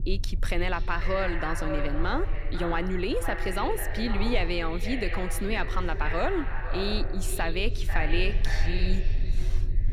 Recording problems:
echo of what is said; strong; throughout; 500 ms later, 6 dB below the speech
low rumble; faint; throughout; 20 dB below the speech

